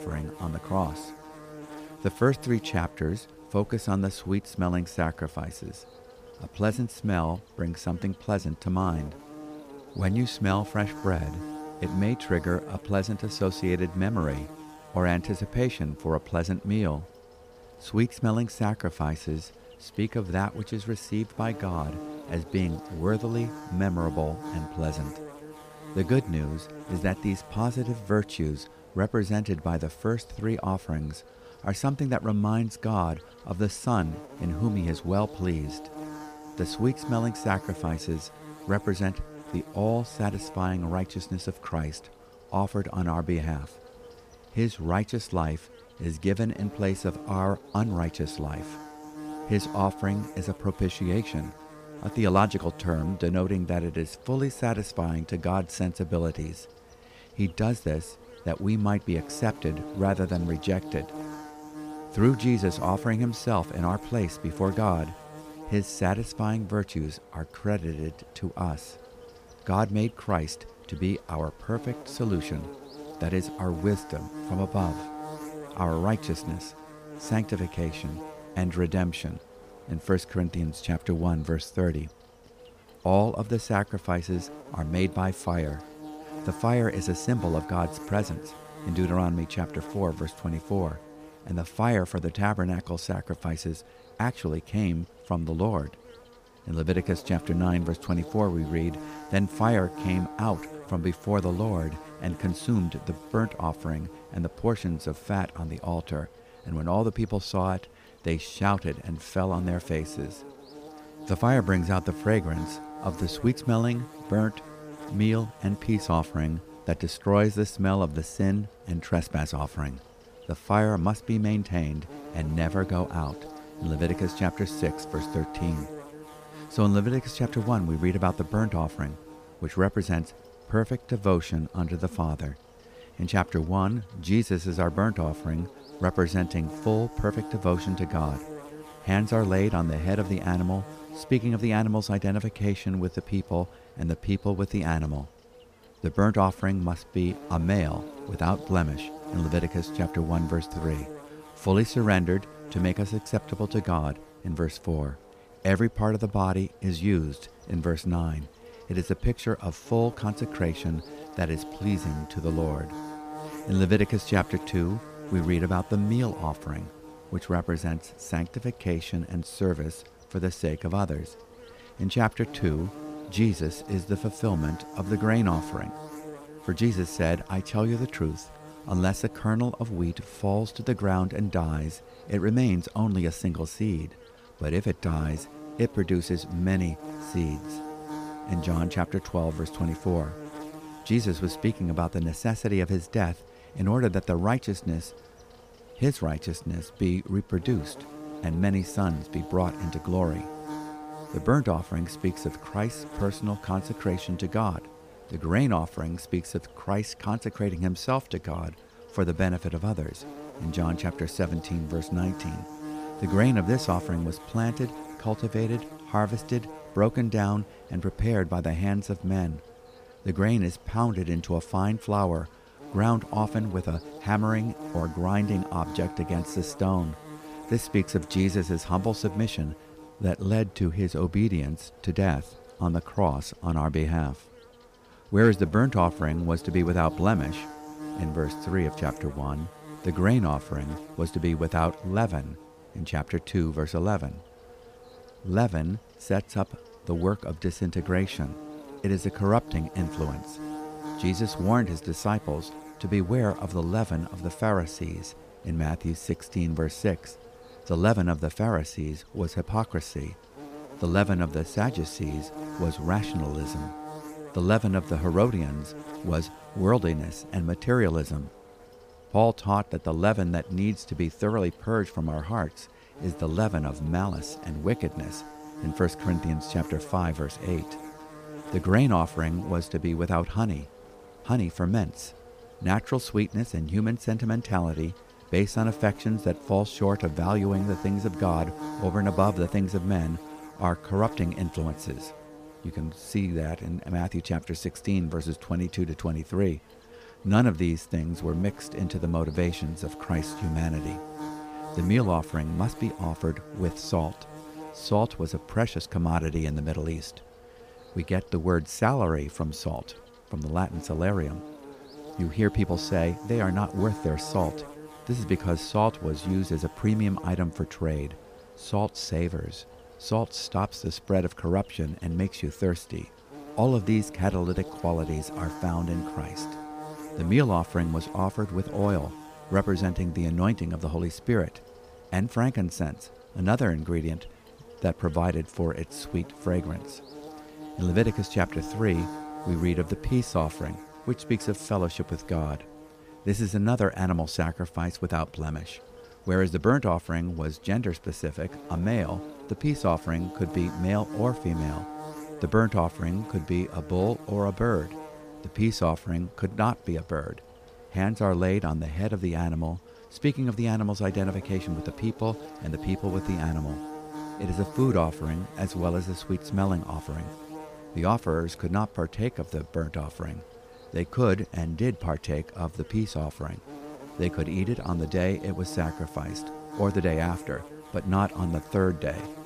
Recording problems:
electrical hum; noticeable; throughout; 50 Hz, 15 dB below the speech

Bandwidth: 15 kHz